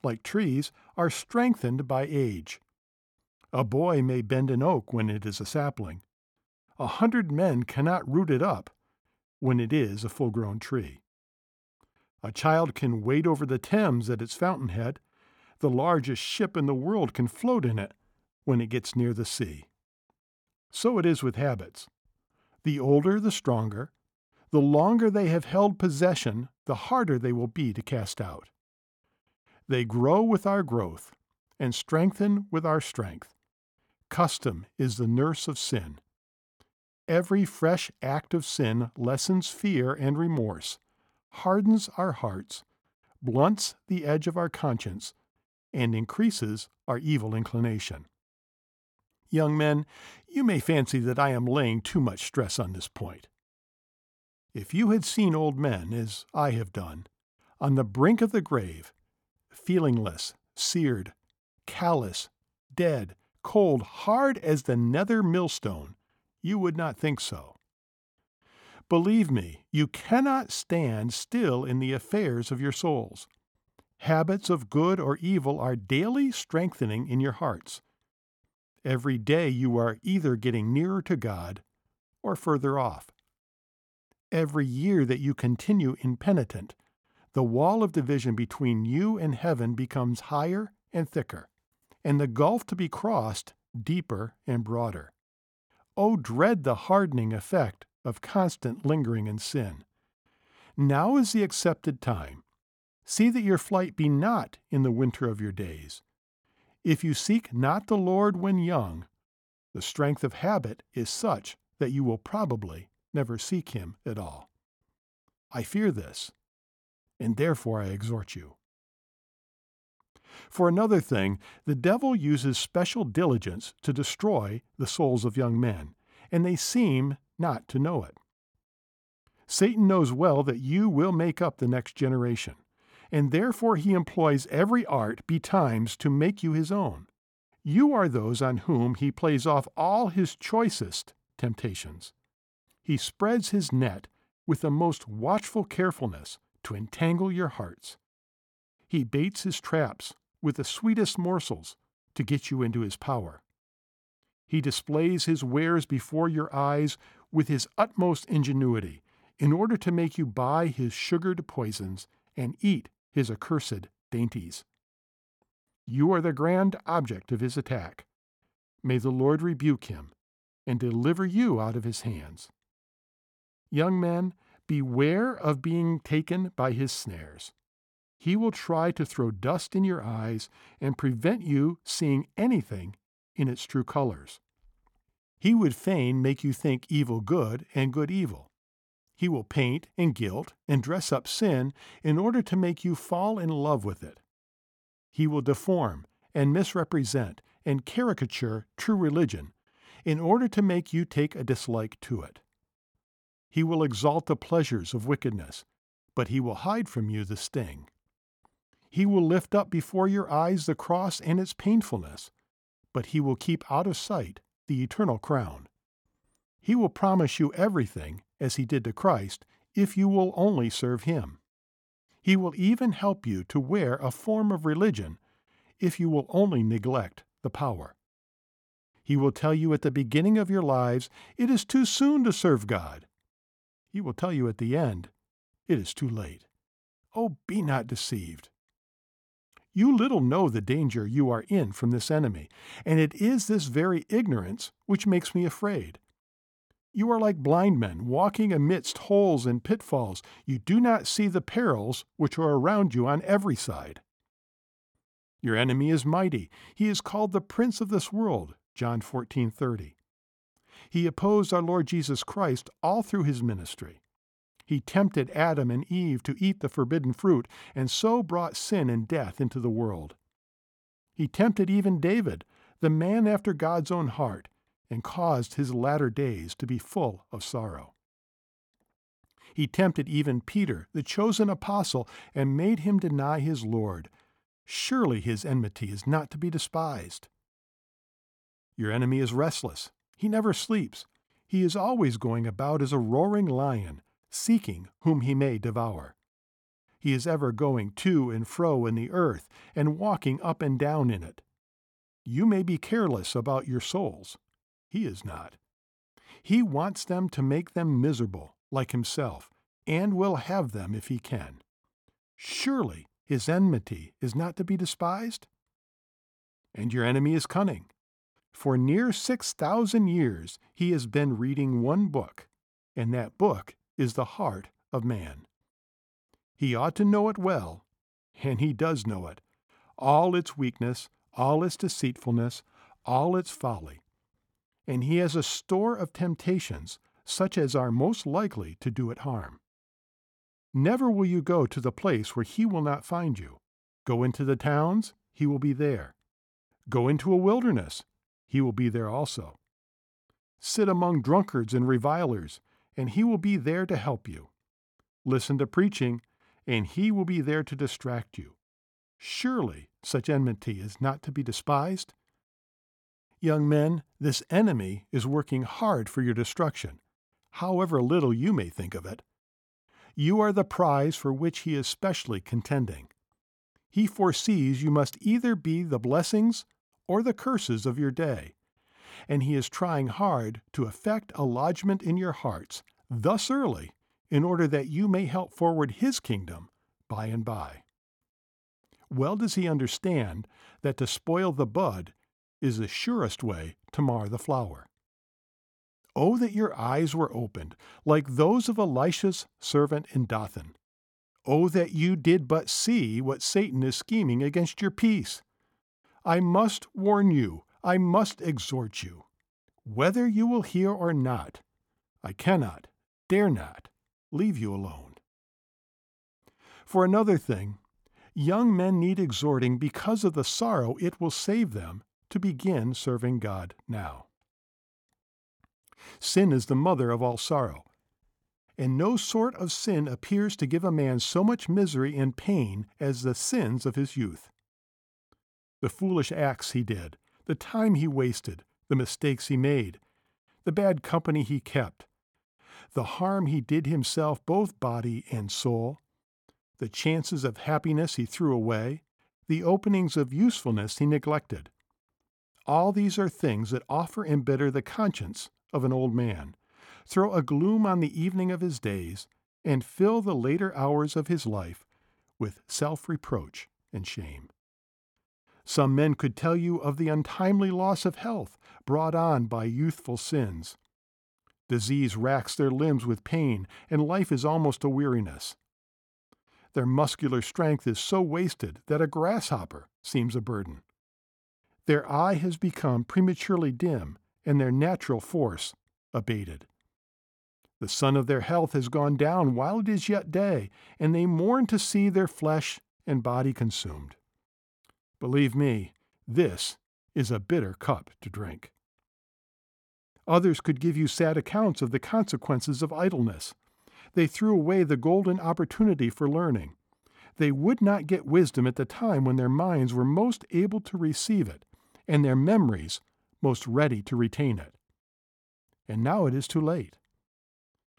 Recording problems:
none

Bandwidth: 18 kHz